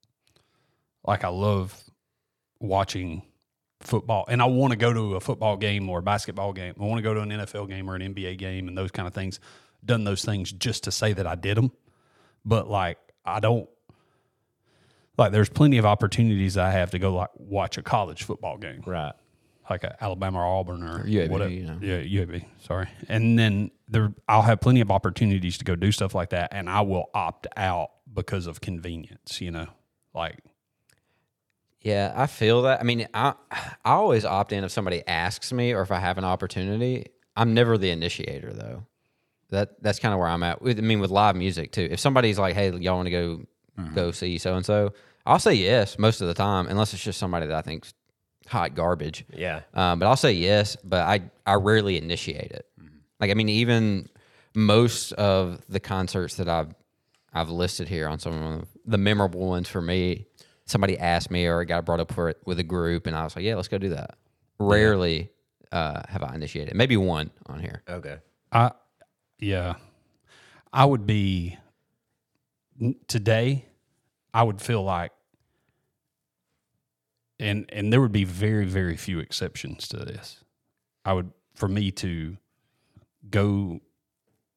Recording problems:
none

